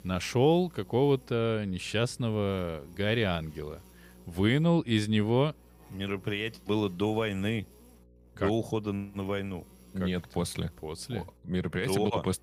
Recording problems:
electrical hum; faint; throughout; 60 Hz, 30 dB below the speech

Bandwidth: 15 kHz